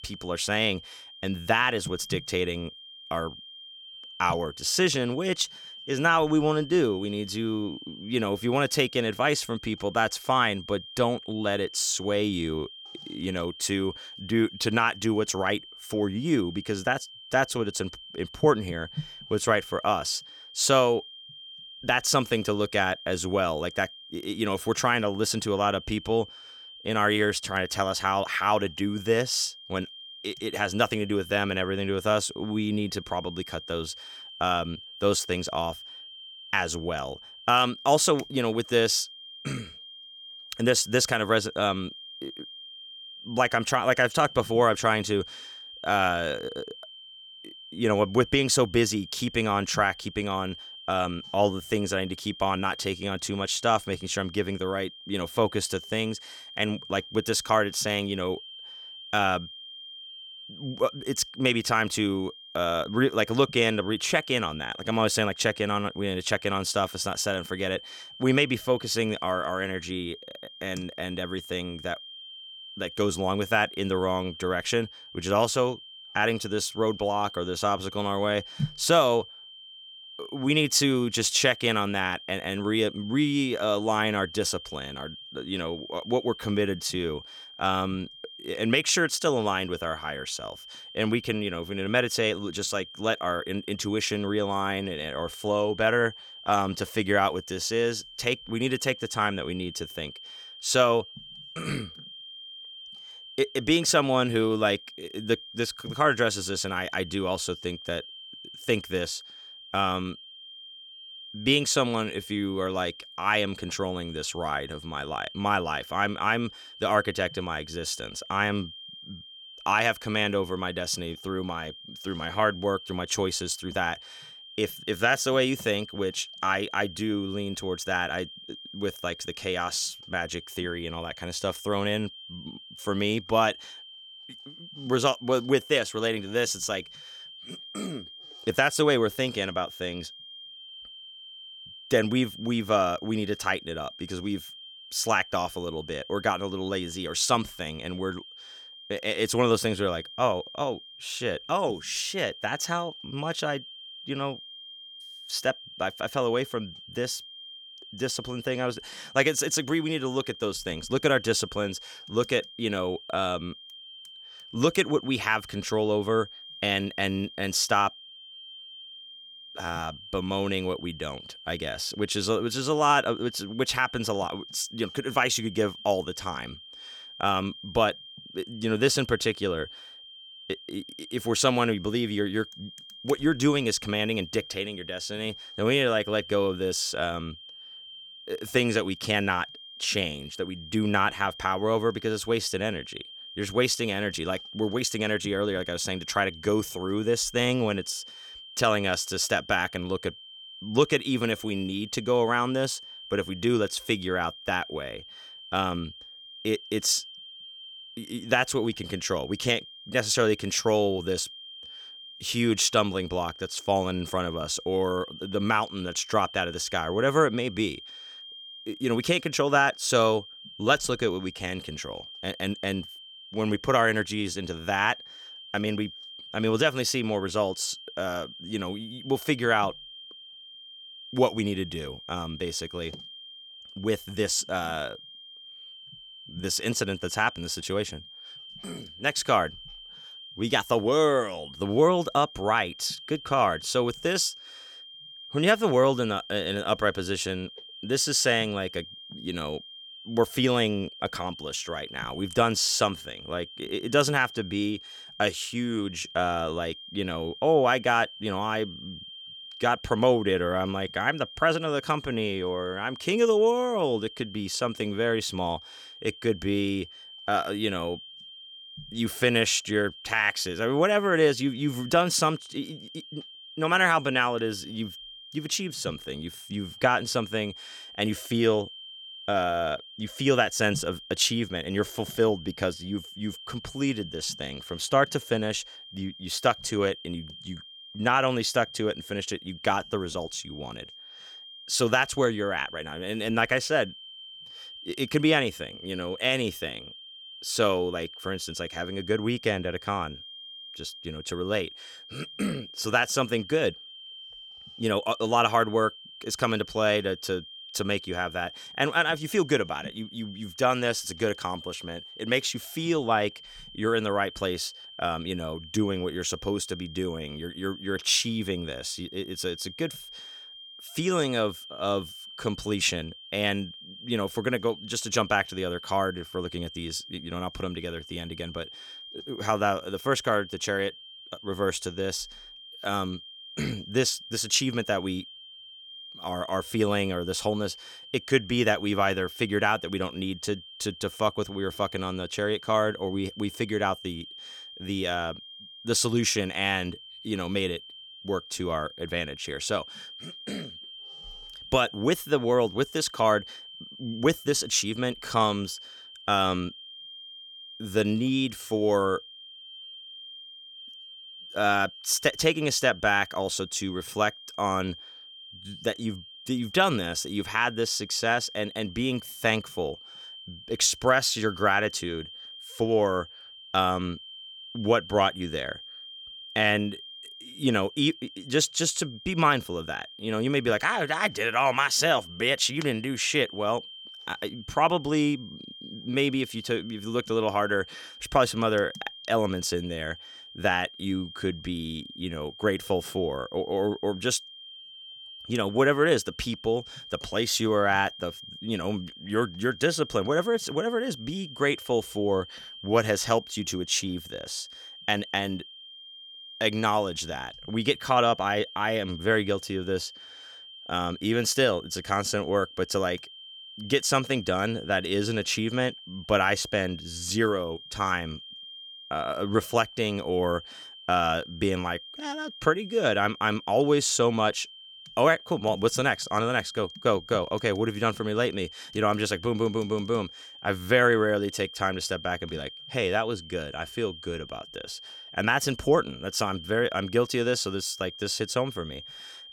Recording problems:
high-pitched whine; noticeable; throughout; 3 kHz, 15 dB below the speech

